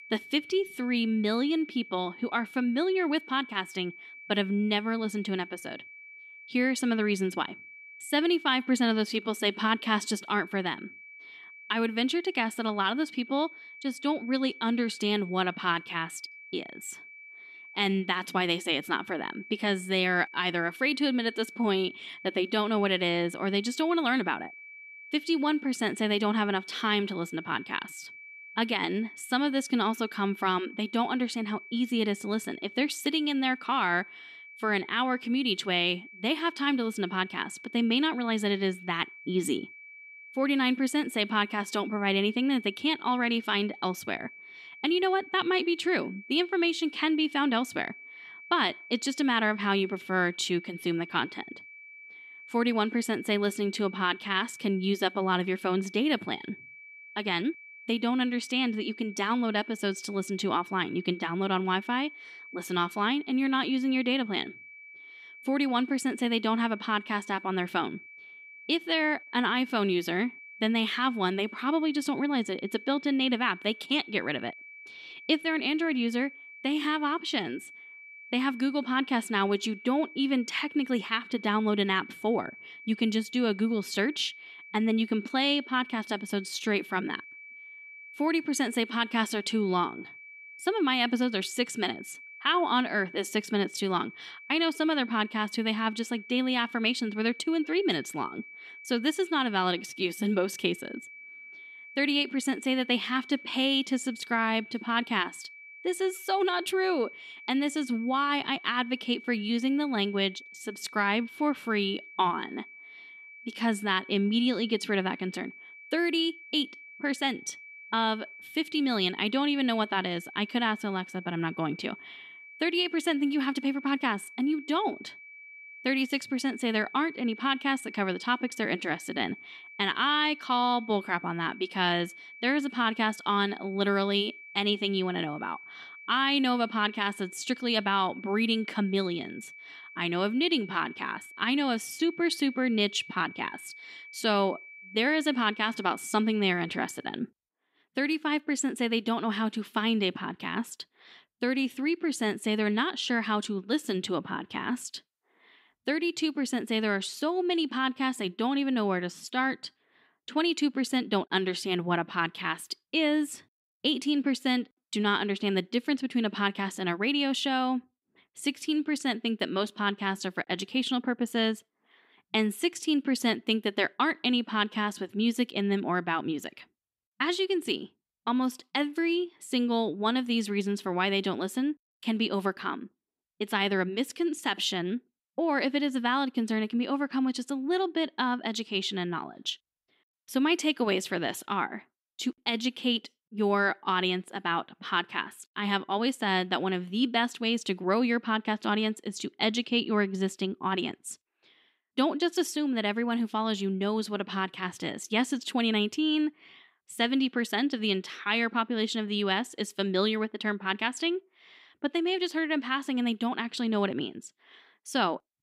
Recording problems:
high-pitched whine; noticeable; until 2:27; 2.5 kHz, 15 dB below the speech

